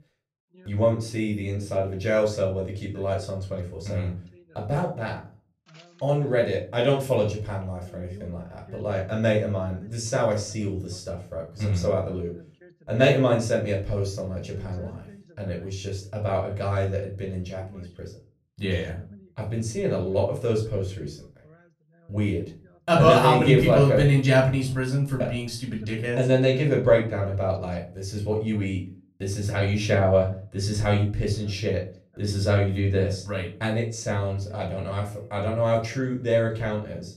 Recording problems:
off-mic speech; far
room echo; slight; dies away in 0.3 s
voice in the background; faint; throughout; 30 dB below the speech

